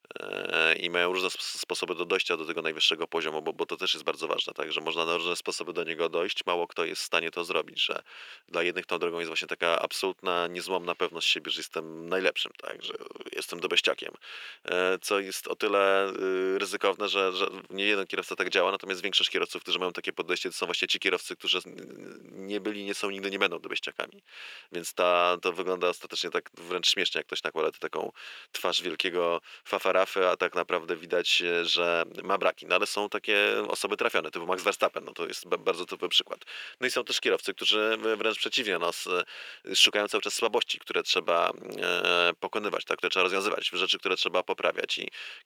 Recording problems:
thin; very; fading below 400 Hz
uneven, jittery; strongly; from 5.5 to 44 s

